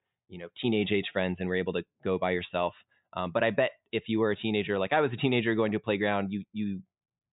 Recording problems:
high frequencies cut off; severe; nothing above 4 kHz

